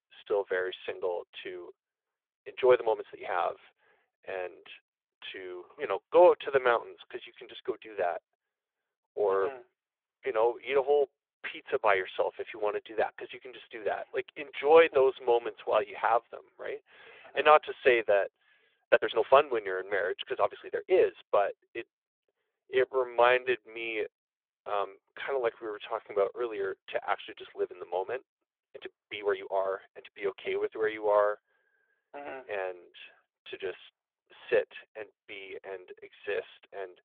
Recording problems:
phone-call audio; nothing above 3.5 kHz
uneven, jittery; strongly; from 2.5 to 30 s

